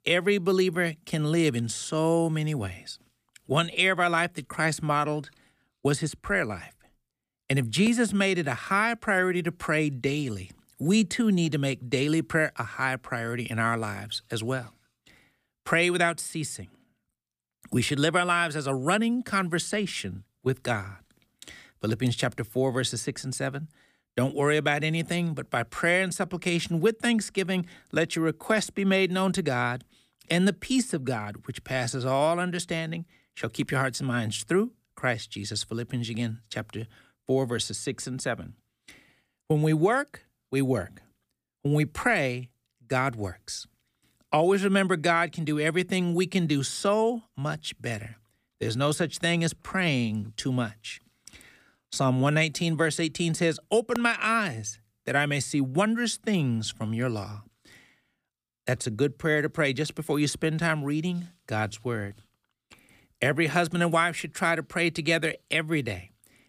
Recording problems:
none

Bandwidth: 15 kHz